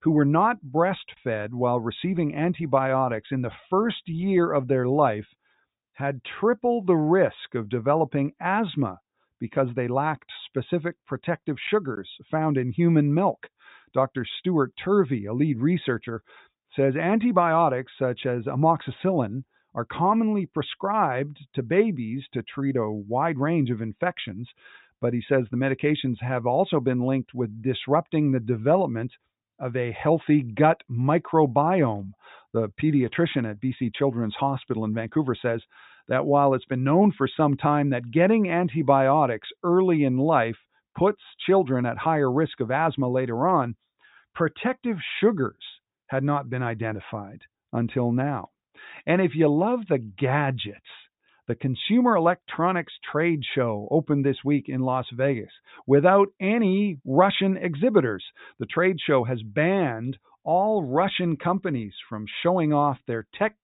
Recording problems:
high frequencies cut off; severe; nothing above 4 kHz

